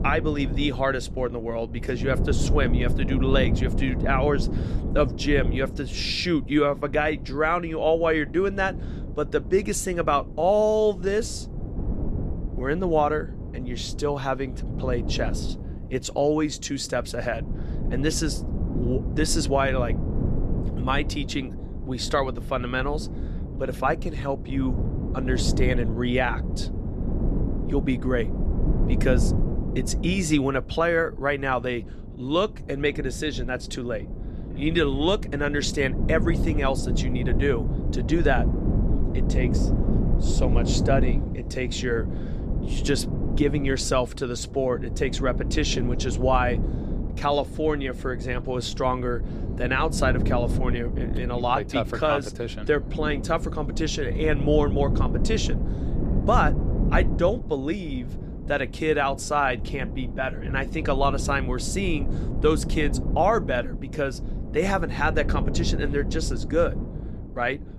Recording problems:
wind noise on the microphone; occasional gusts; 10 dB below the speech

